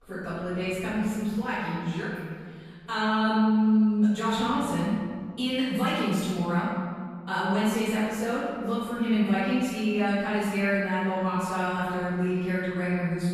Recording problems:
room echo; strong; dies away in 2 s
off-mic speech; far

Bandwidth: 14.5 kHz